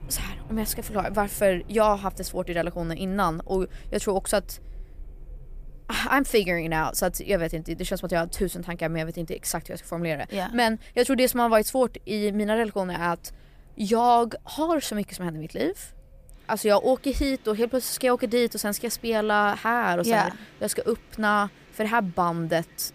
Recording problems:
wind in the background; faint; throughout; 25 dB below the speech

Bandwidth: 15 kHz